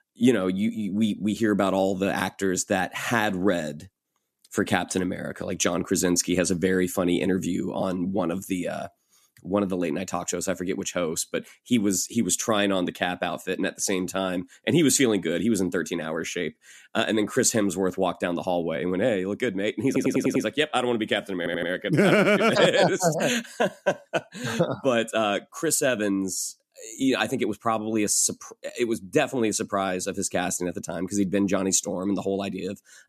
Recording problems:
audio stuttering; at 20 s and at 21 s

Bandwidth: 14.5 kHz